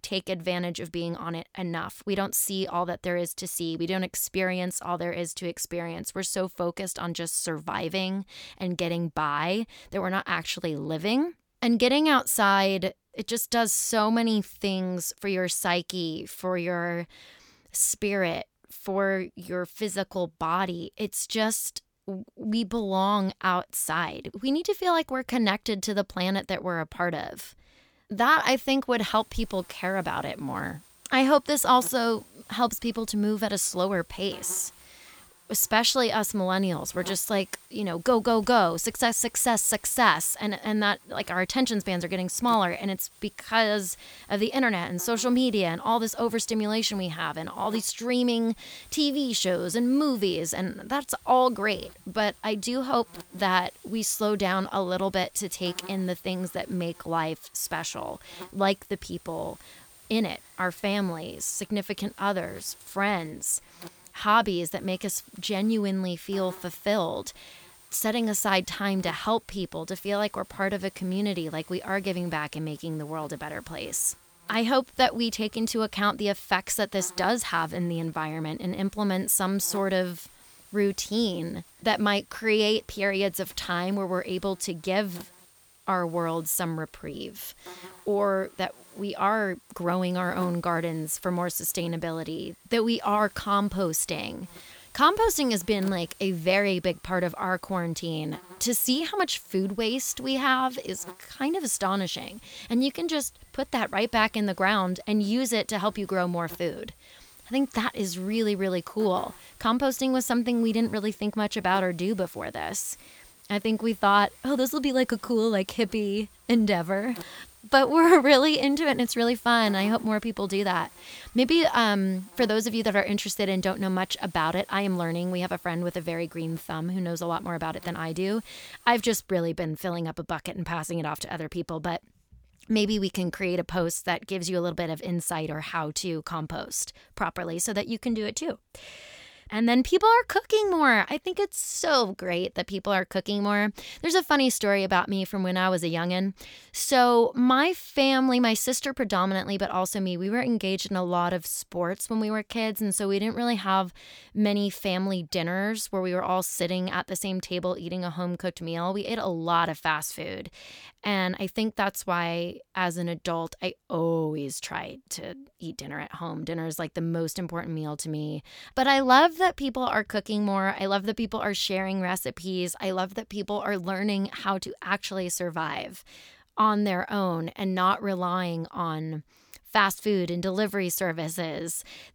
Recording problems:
electrical hum; faint; from 29 s to 2:09; 60 Hz, 25 dB below the speech

